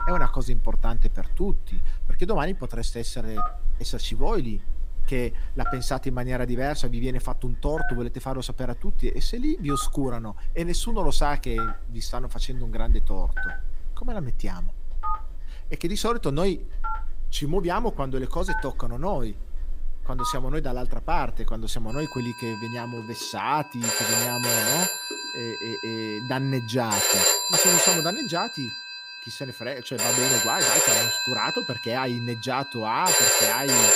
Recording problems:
alarms or sirens; very loud; throughout; 5 dB above the speech

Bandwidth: 15.5 kHz